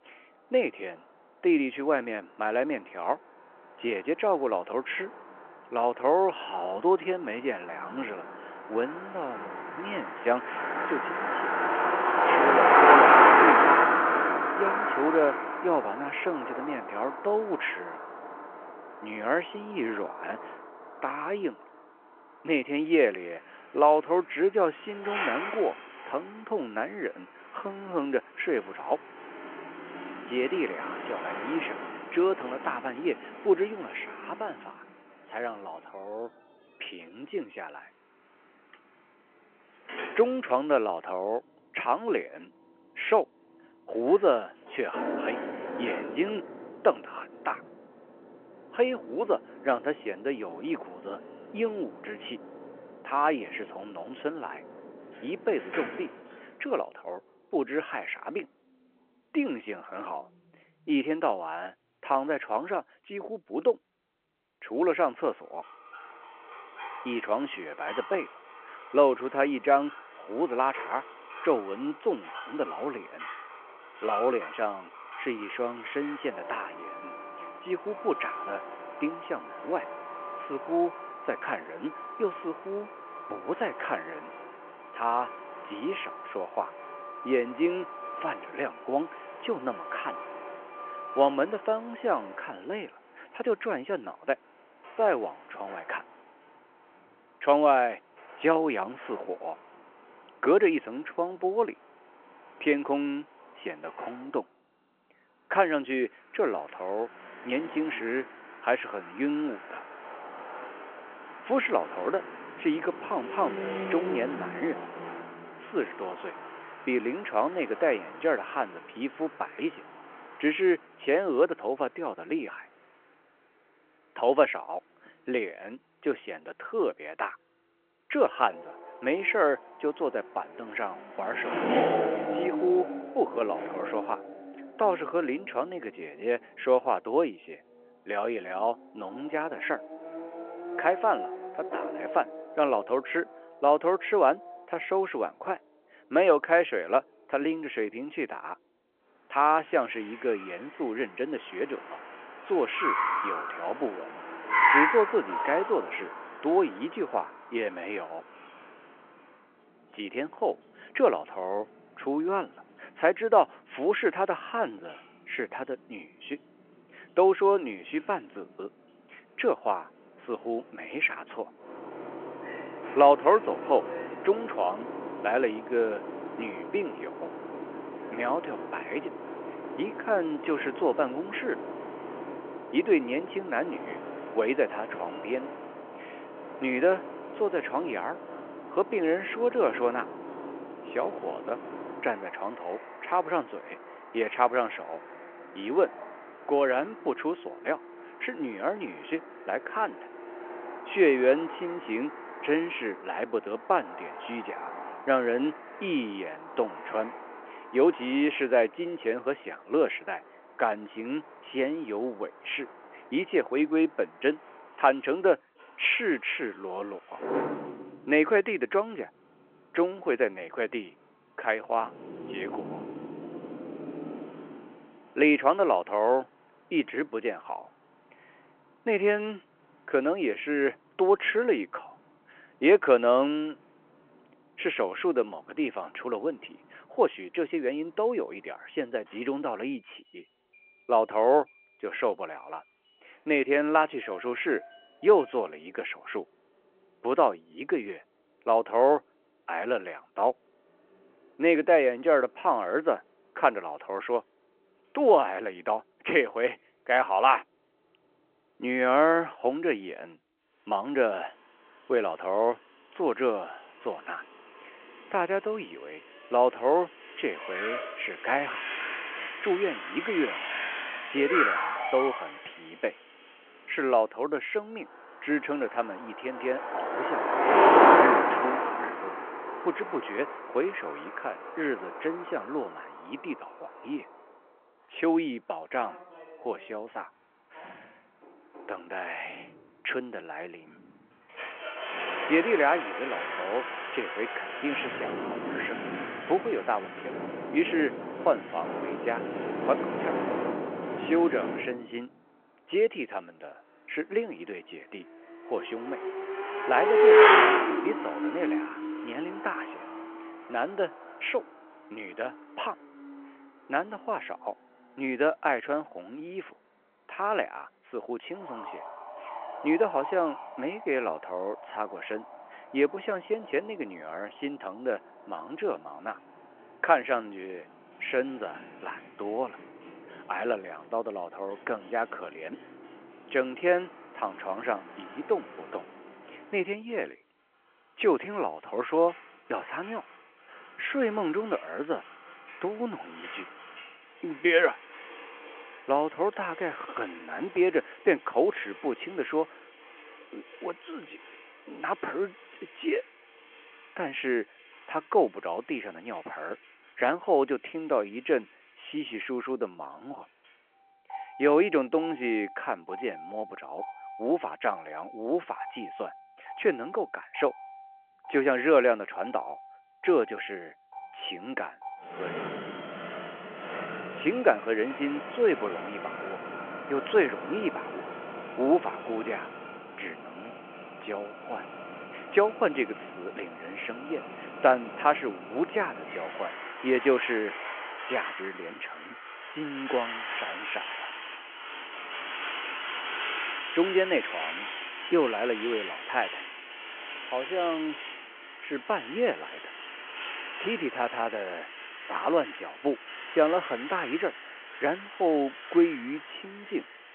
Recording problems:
phone-call audio
traffic noise; loud; throughout; 2 dB below the speech

